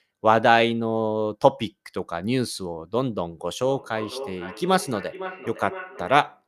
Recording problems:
echo of what is said; noticeable; from 3.5 s on; 510 ms later, 15 dB below the speech

